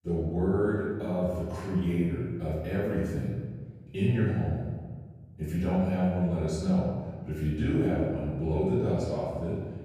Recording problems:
room echo; strong; dies away in 1.4 s
off-mic speech; far

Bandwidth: 15 kHz